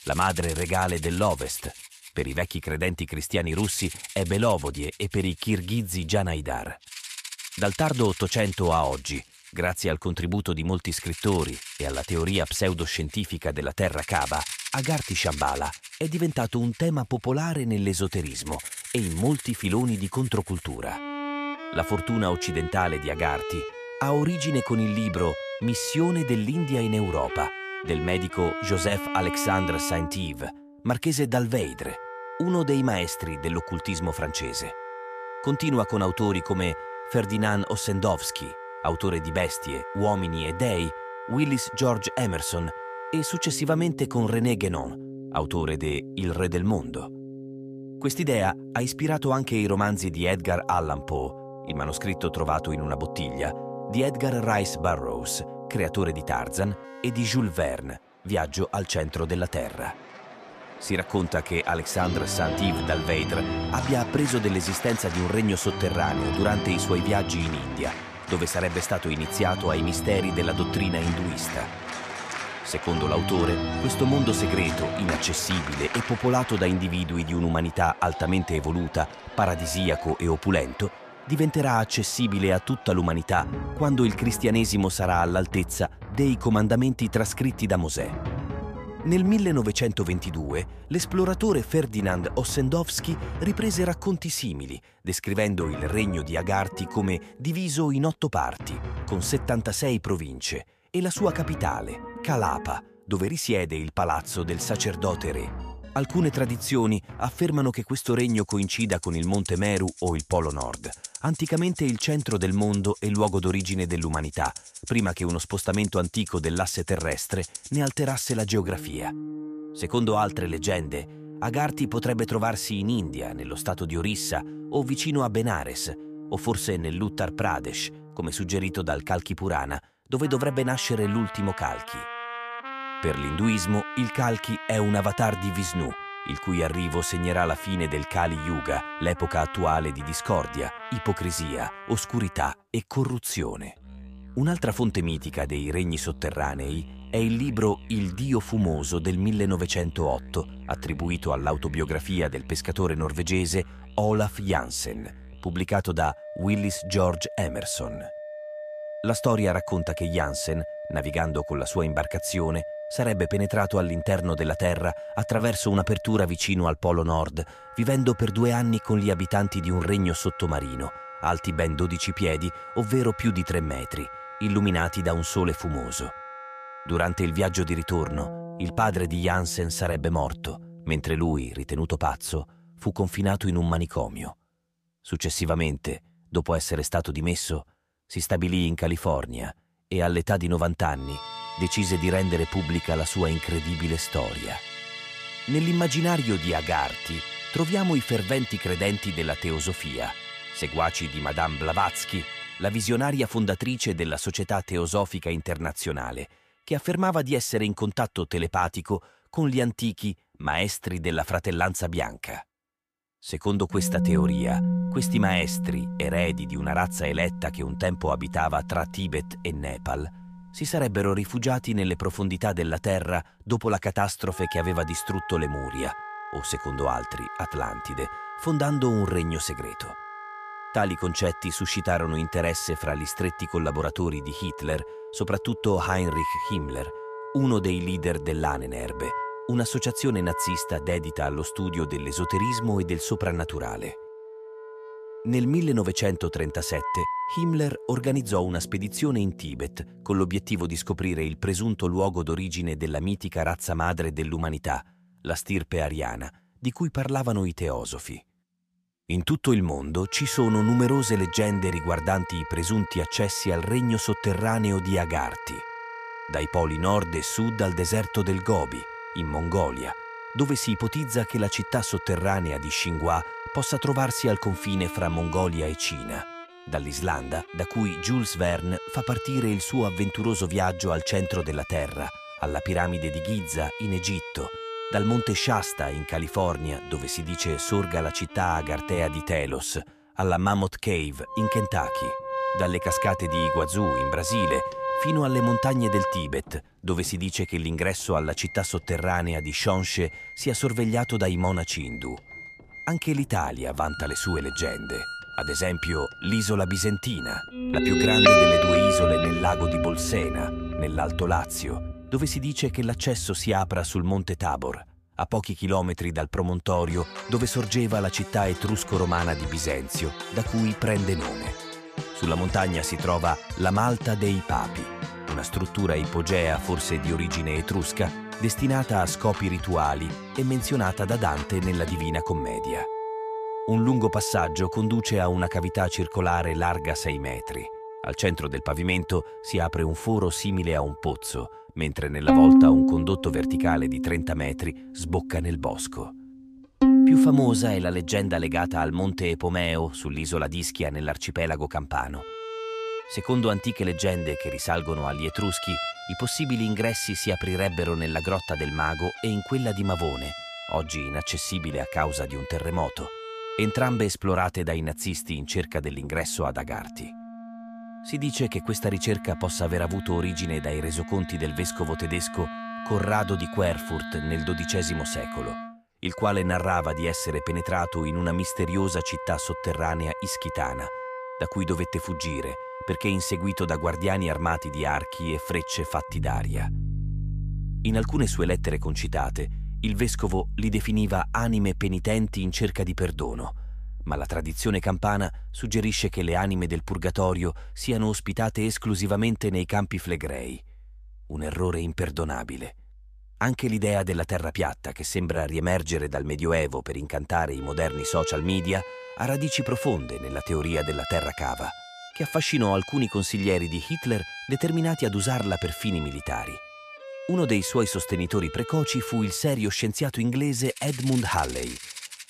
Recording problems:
background music; loud; throughout; 6 dB below the speech

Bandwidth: 14.5 kHz